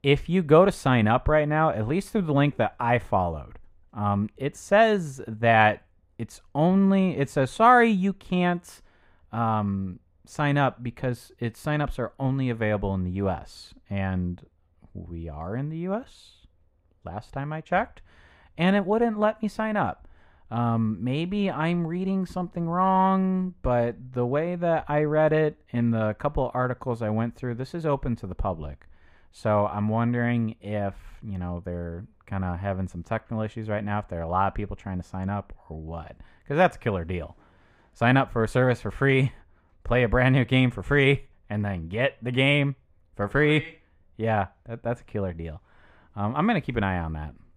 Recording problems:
muffled; slightly; fading above 3.5 kHz

